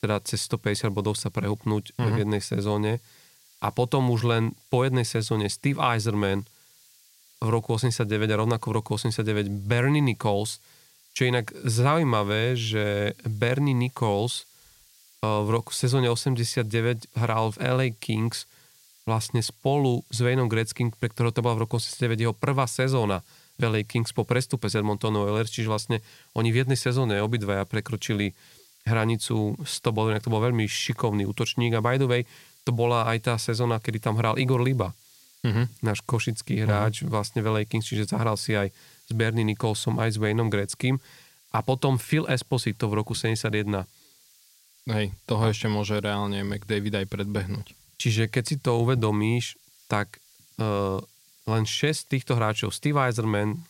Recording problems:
hiss; faint; throughout; 30 dB below the speech

